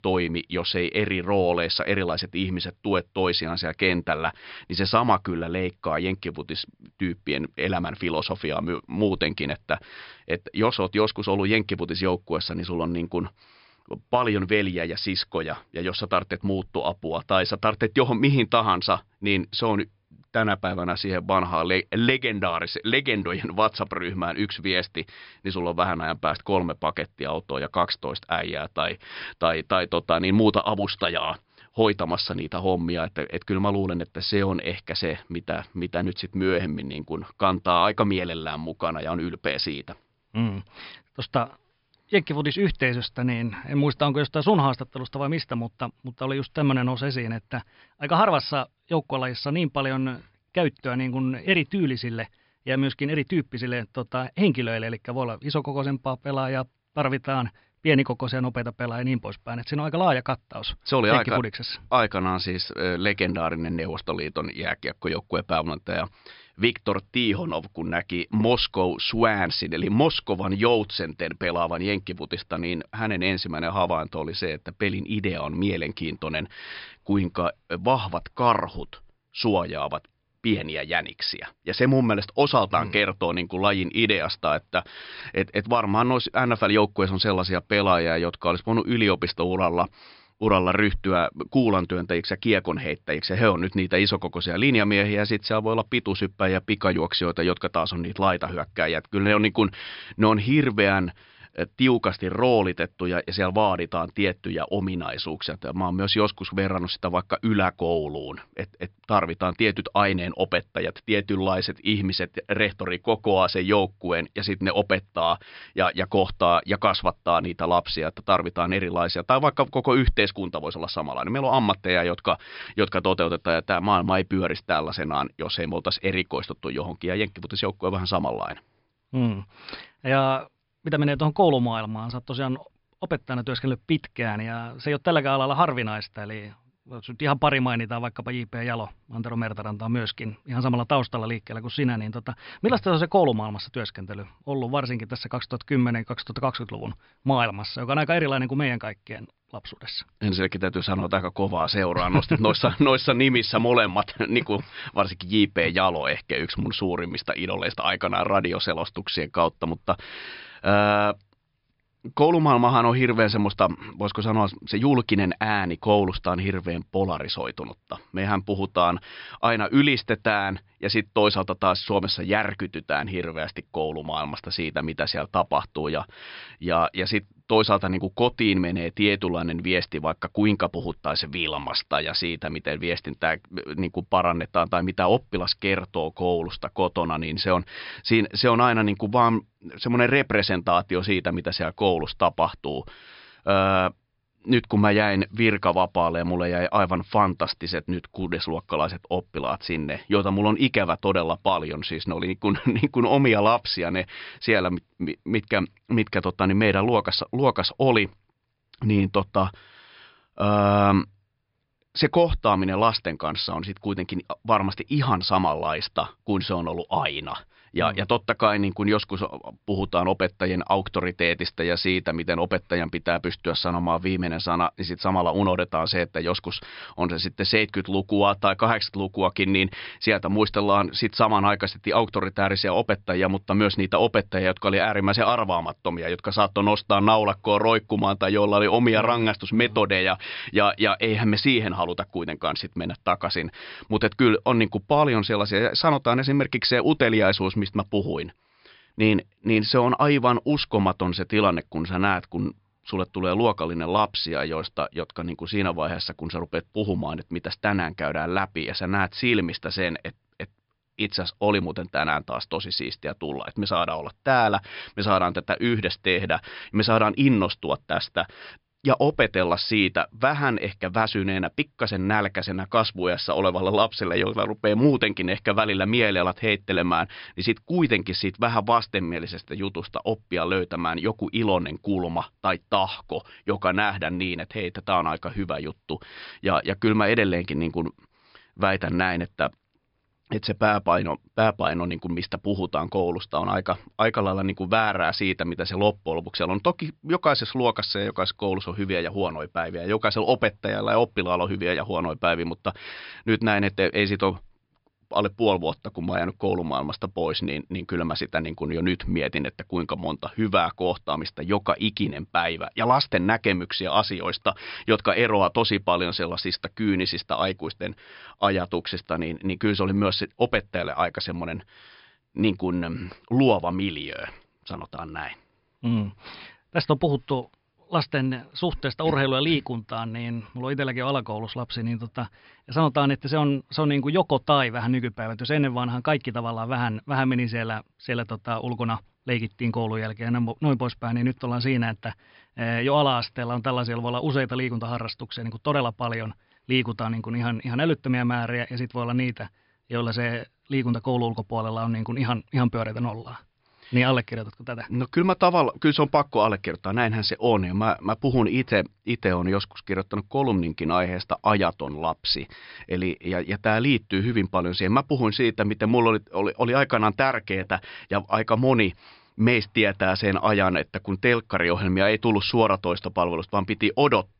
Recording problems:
high frequencies cut off; noticeable; nothing above 5.5 kHz

